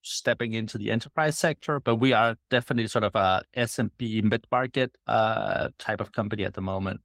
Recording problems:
garbled, watery; slightly; nothing above 16 kHz

